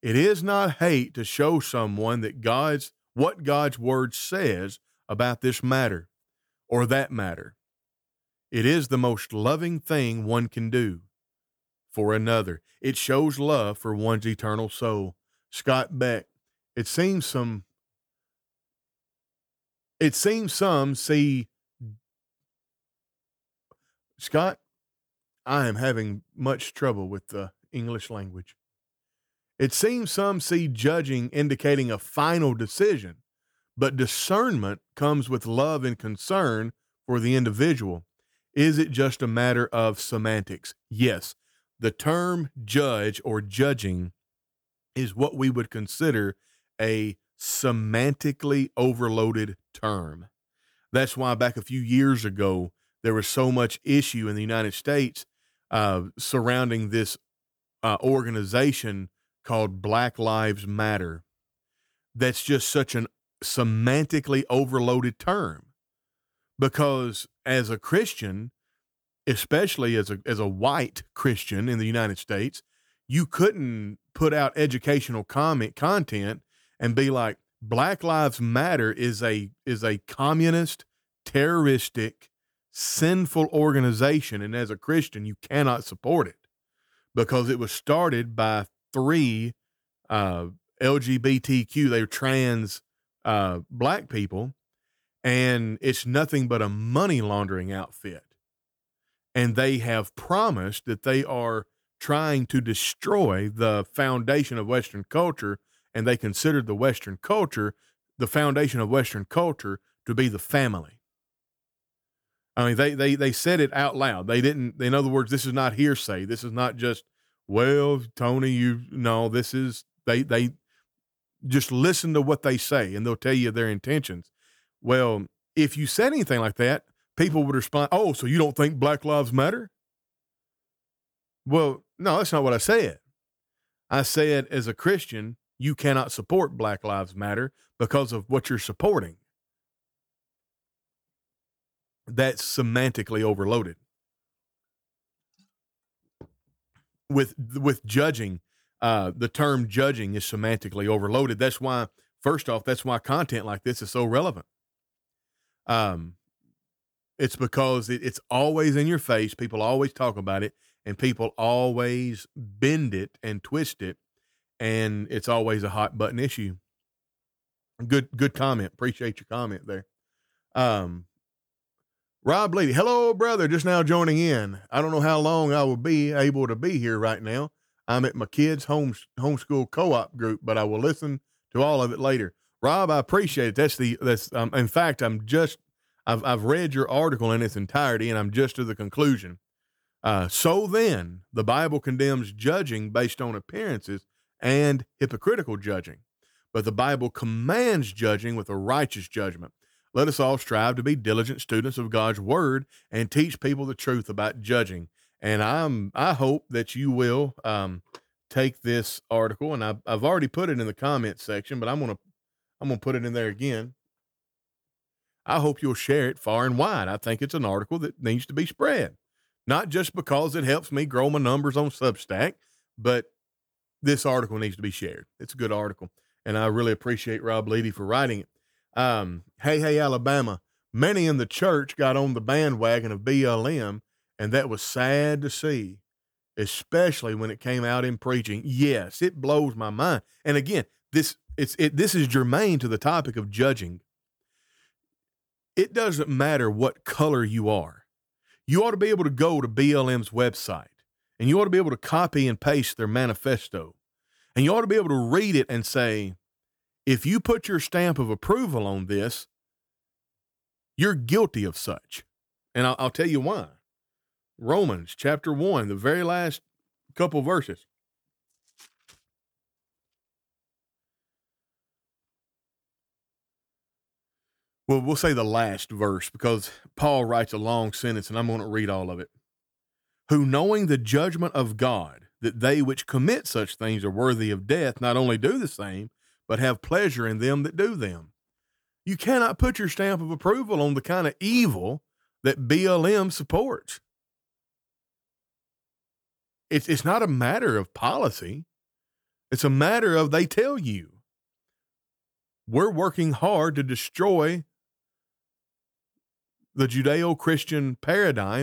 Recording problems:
abrupt cut into speech; at the end

